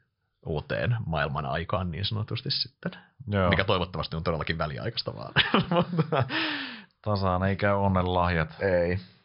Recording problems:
high frequencies cut off; noticeable; nothing above 5.5 kHz

